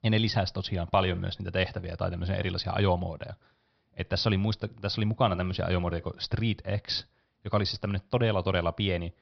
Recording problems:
high frequencies cut off; noticeable; nothing above 5.5 kHz

